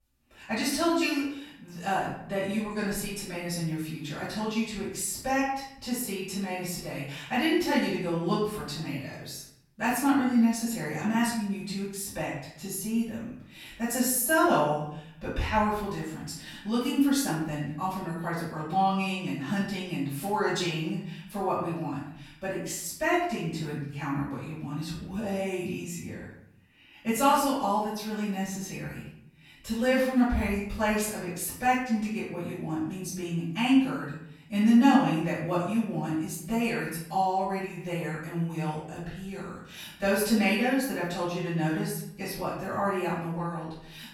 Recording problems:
off-mic speech; far
room echo; noticeable; dies away in 0.6 s

